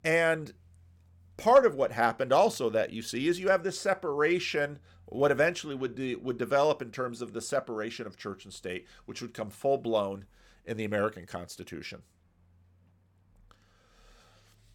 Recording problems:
none

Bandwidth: 17 kHz